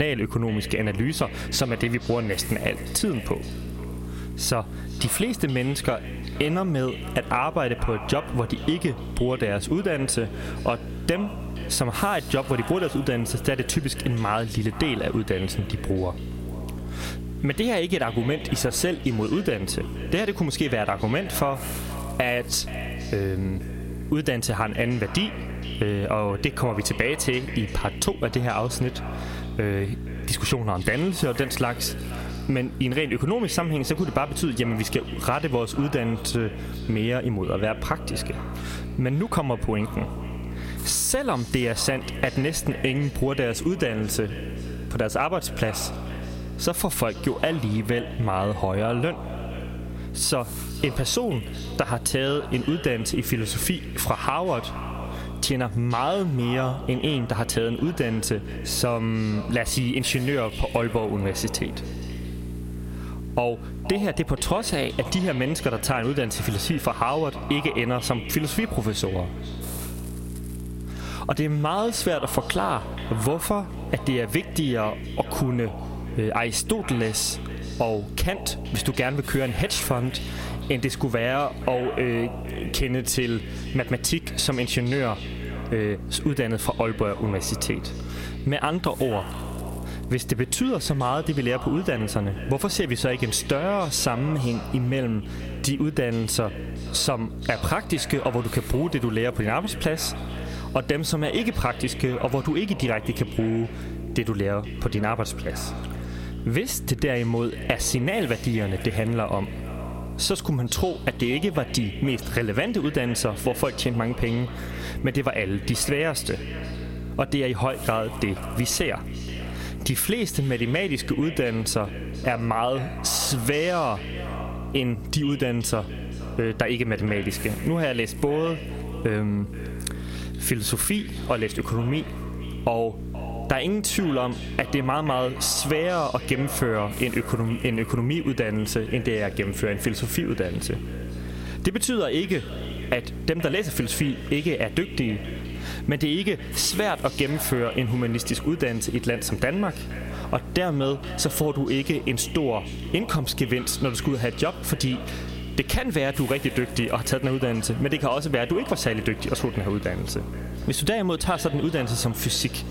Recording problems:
echo of what is said; noticeable; throughout; 480 ms later, 15 dB below the speech
squashed, flat; somewhat
electrical hum; noticeable; throughout; 60 Hz, 20 dB below the speech
hiss; faint; throughout; 25 dB below the speech
abrupt cut into speech; at the start

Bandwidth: 16 kHz